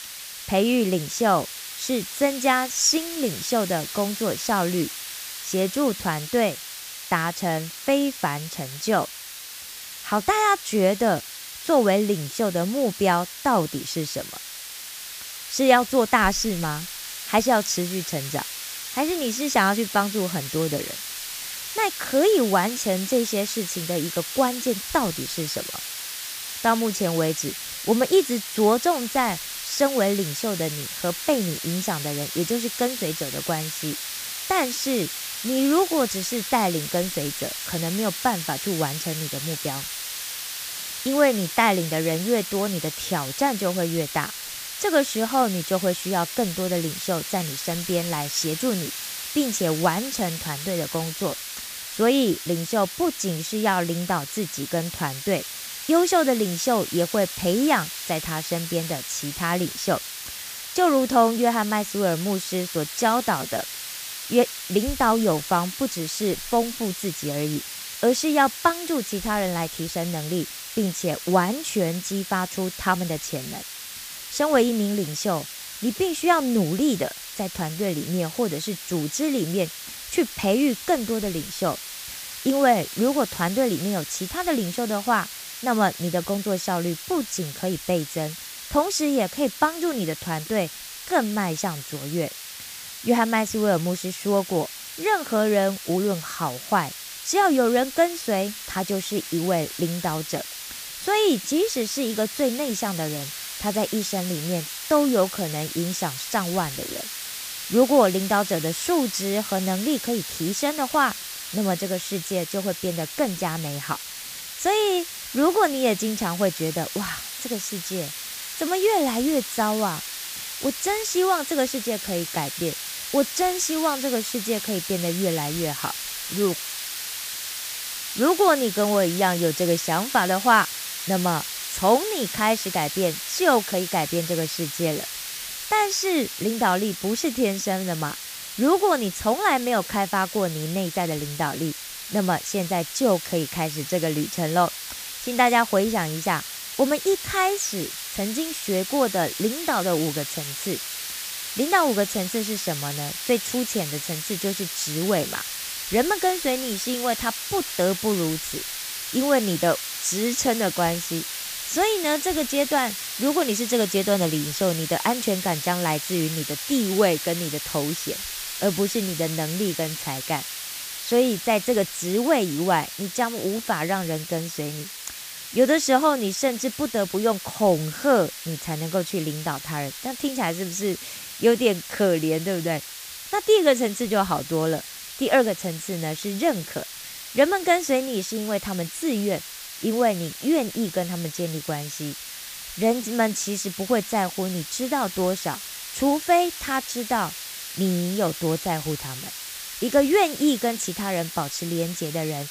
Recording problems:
hiss; loud; throughout; 7 dB below the speech

